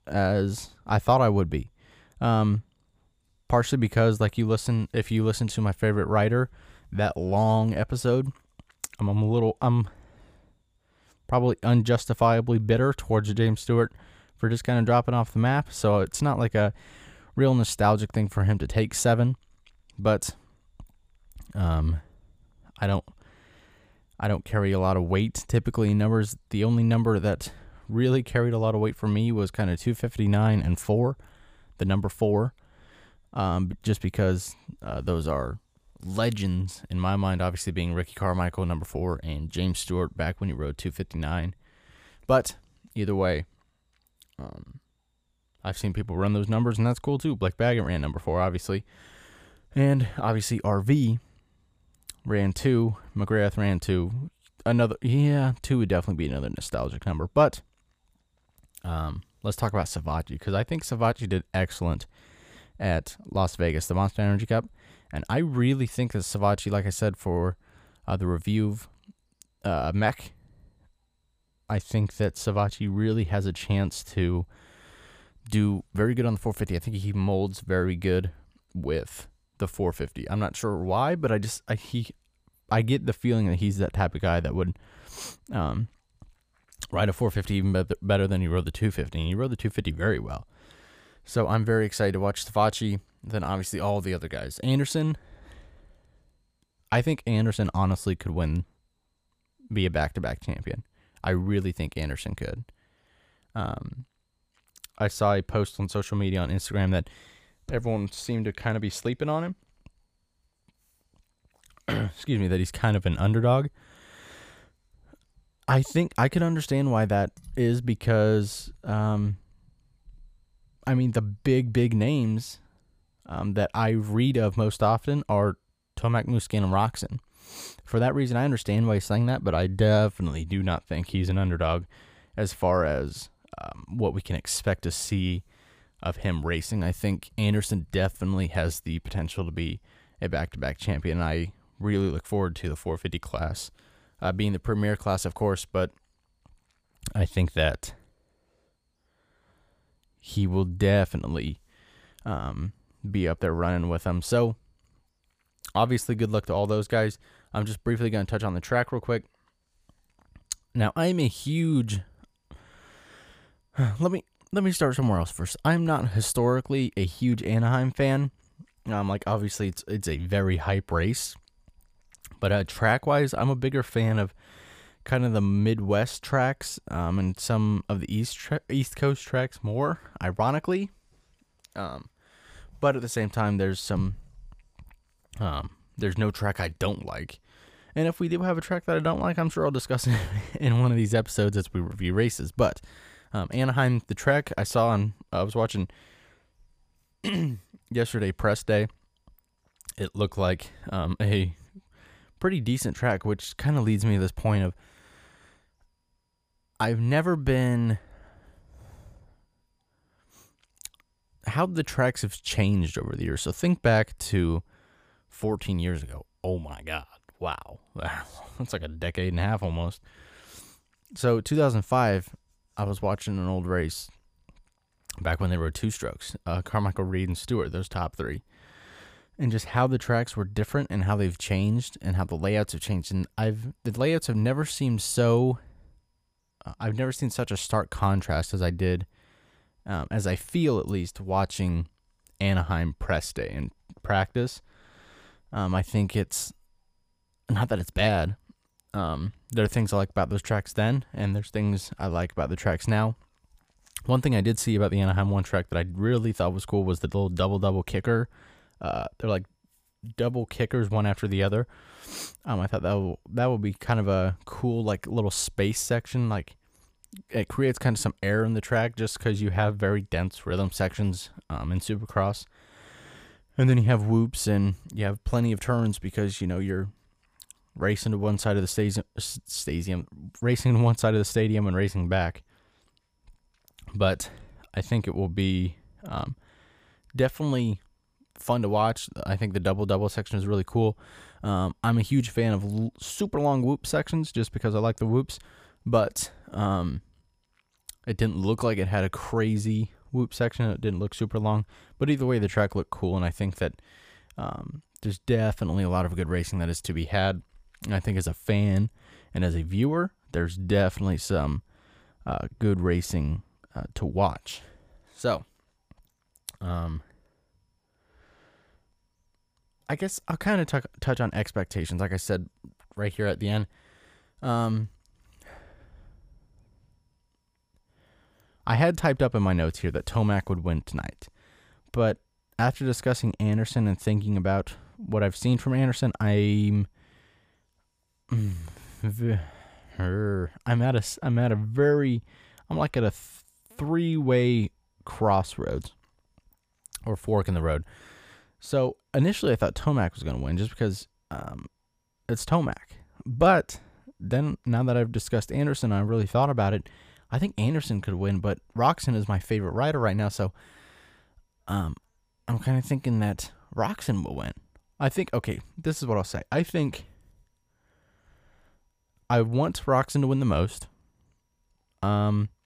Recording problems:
none

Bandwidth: 15 kHz